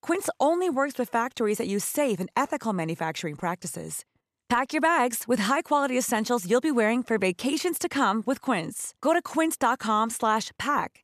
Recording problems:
none

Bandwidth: 14 kHz